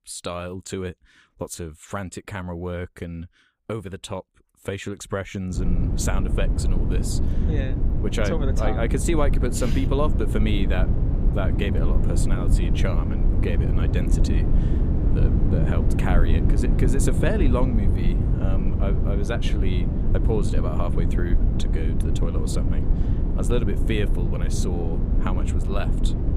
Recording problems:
low rumble; loud; from 5.5 s on; 3 dB below the speech

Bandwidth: 15 kHz